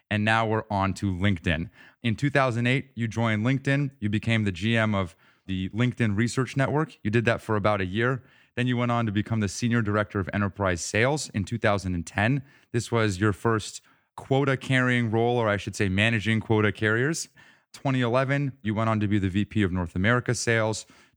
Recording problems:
none

